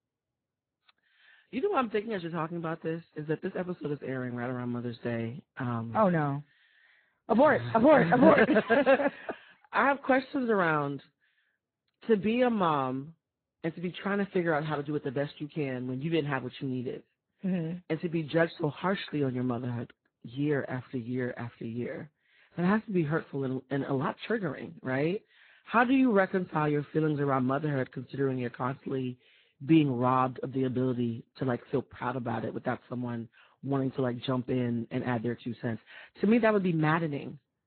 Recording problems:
garbled, watery; badly
high frequencies cut off; severe; nothing above 4 kHz

